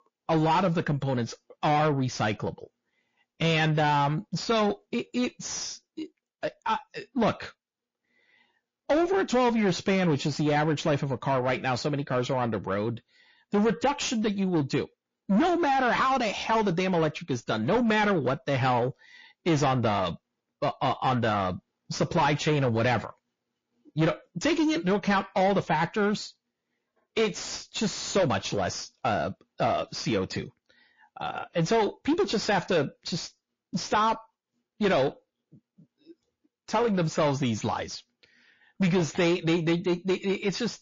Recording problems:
distortion; heavy; 7 dB below the speech
garbled, watery; slightly; nothing above 6 kHz

